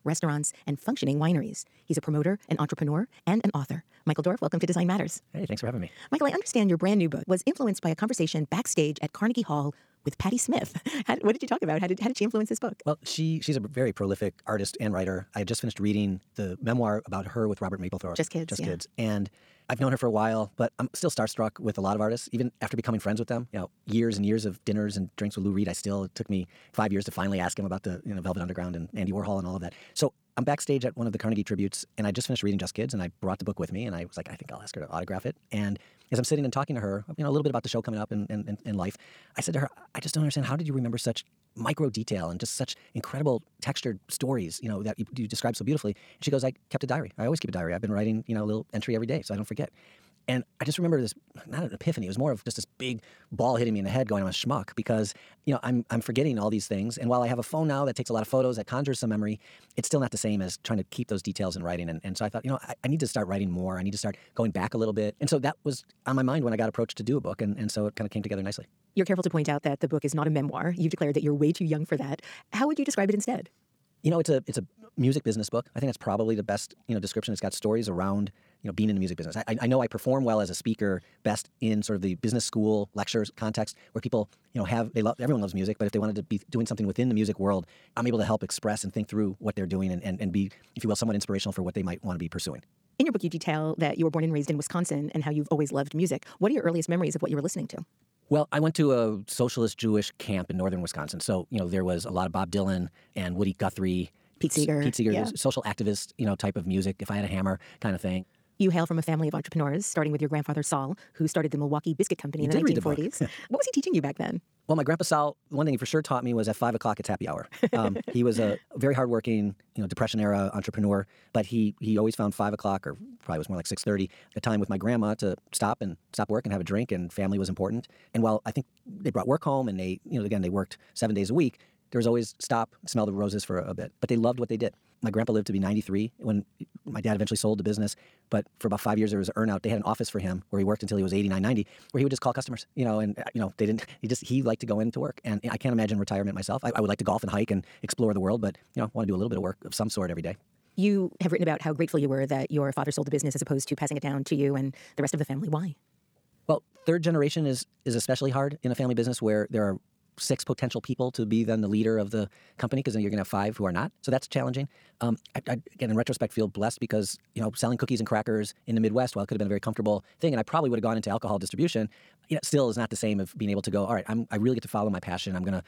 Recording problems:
wrong speed, natural pitch; too fast; 1.8 times normal speed

